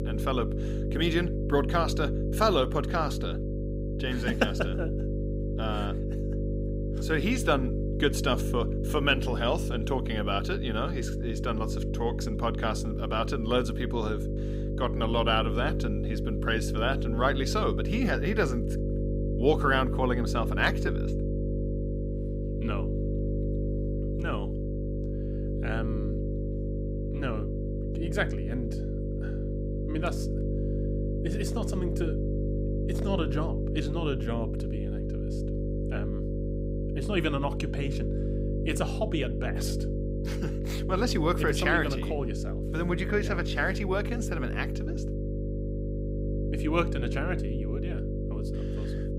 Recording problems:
electrical hum; loud; throughout; 50 Hz, 7 dB below the speech

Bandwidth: 15.5 kHz